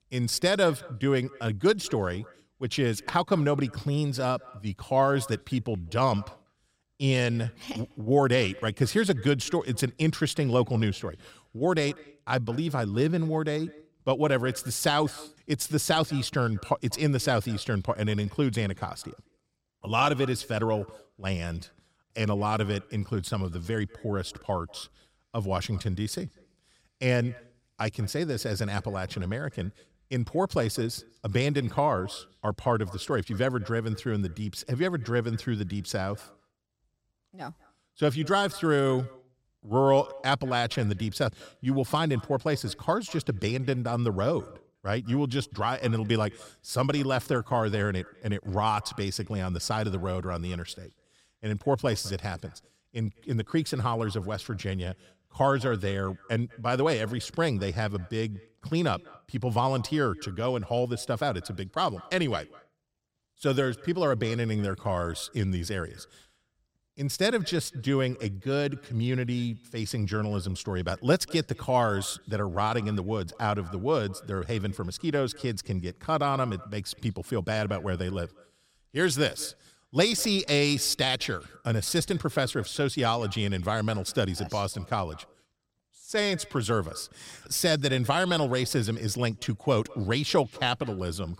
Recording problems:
echo of what is said; faint; throughout; 200 ms later, 25 dB below the speech

